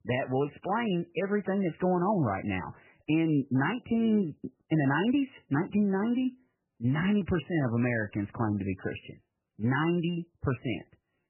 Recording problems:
garbled, watery; badly; nothing above 3 kHz

